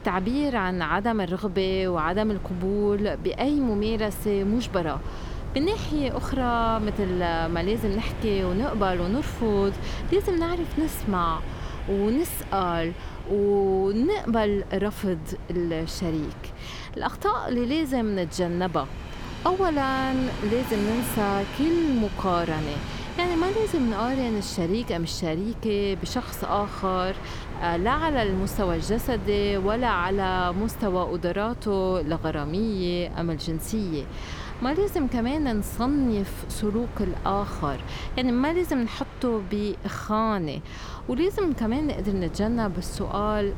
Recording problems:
train or aircraft noise; noticeable; throughout; 15 dB below the speech
wind noise on the microphone; occasional gusts; 15 dB below the speech

